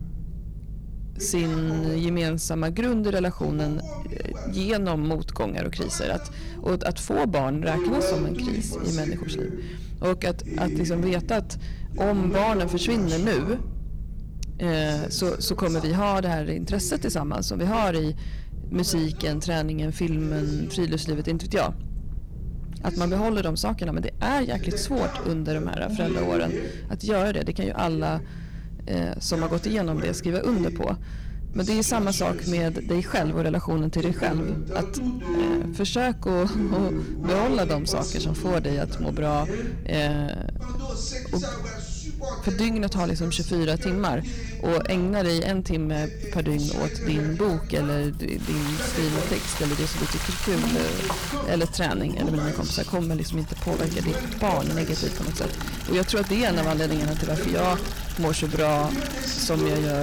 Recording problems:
distortion; slight; 7% of the sound clipped
household noises; loud; from 46 s on; 8 dB below the speech
voice in the background; loud; throughout; 7 dB below the speech
low rumble; faint; throughout; 20 dB below the speech
abrupt cut into speech; at the end

